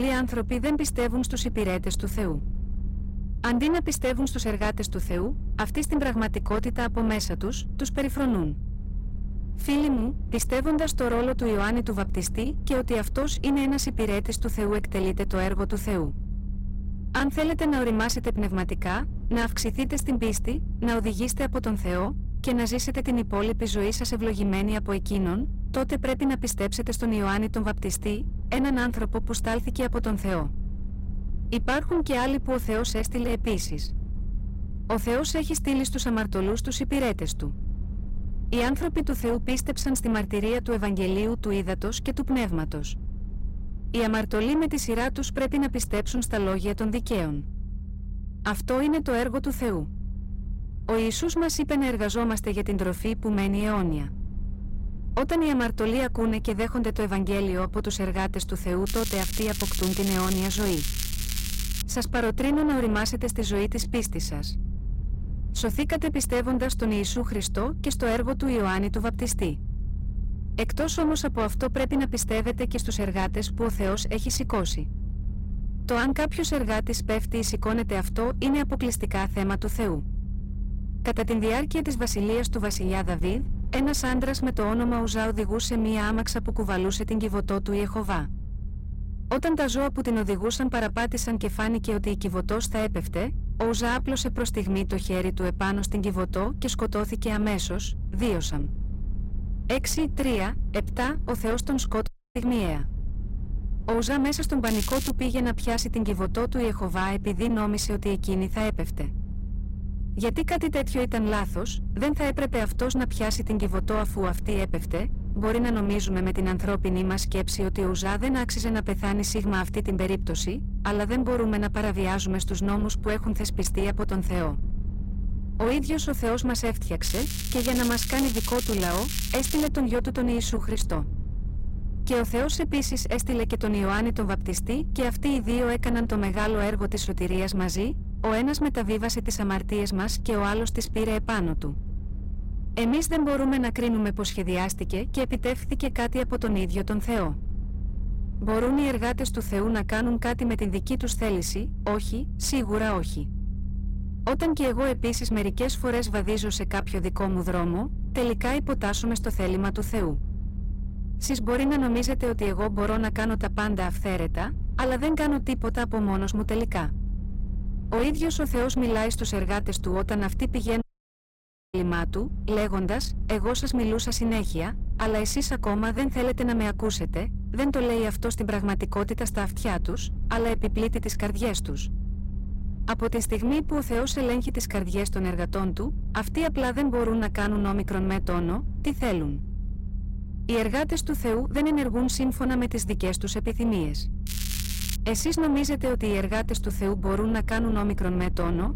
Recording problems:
distortion; slight; 10 dB below the speech
crackling; loud; 4 times, first at 59 s; 6 dB below the speech
low rumble; noticeable; throughout; 15 dB below the speech
abrupt cut into speech; at the start
audio cutting out; at 1:42 and at 2:51 for 1 s

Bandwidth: 16 kHz